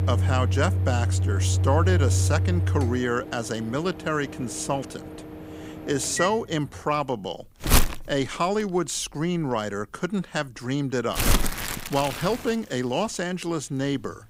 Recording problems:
household noises; very loud; throughout; 2 dB above the speech

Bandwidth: 15.5 kHz